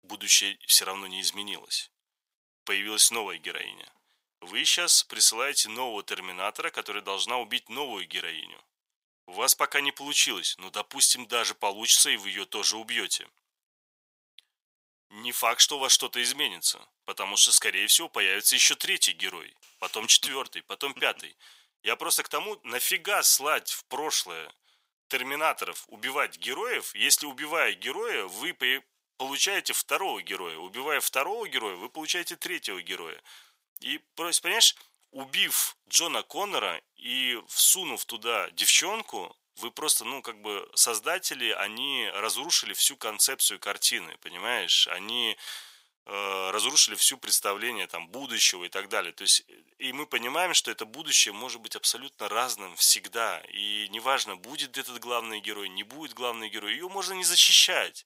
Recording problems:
thin; very; fading below 900 Hz

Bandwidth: 15.5 kHz